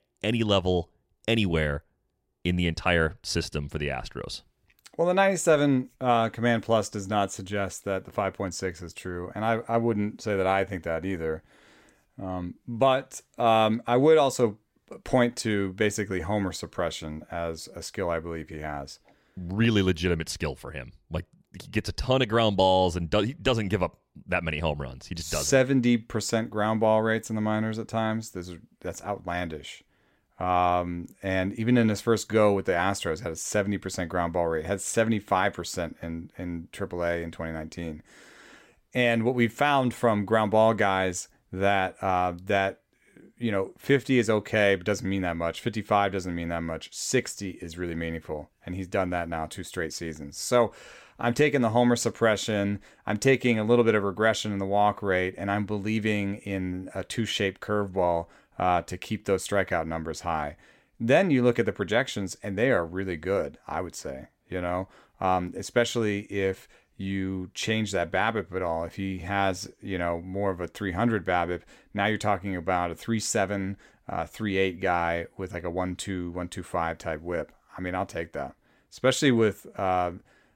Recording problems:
none

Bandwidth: 16 kHz